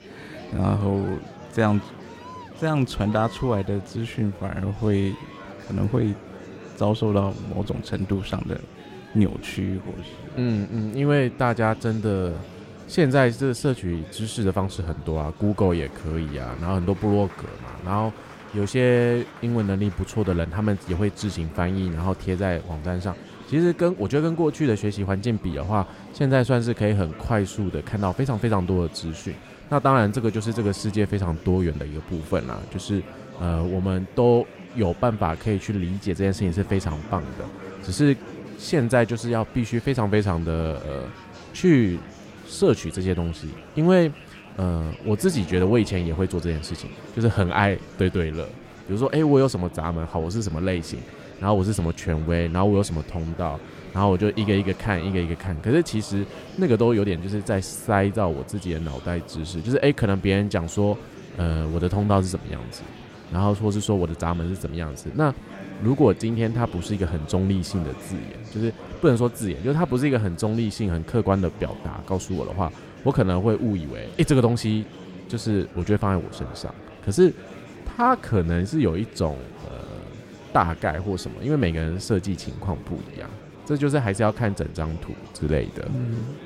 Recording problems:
murmuring crowd; noticeable; throughout; 15 dB below the speech

